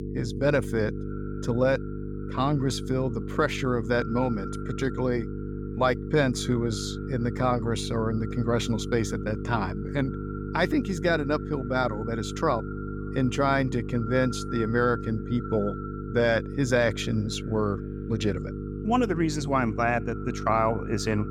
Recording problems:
echo of what is said; faint; throughout; 250 ms later, 20 dB below the speech
electrical hum; noticeable; throughout; 50 Hz, 15 dB below the speech

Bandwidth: 17.5 kHz